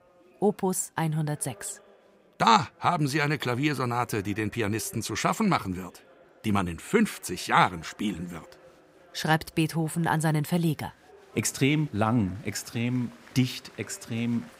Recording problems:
chatter from many people; faint; throughout; 25 dB below the speech

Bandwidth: 15.5 kHz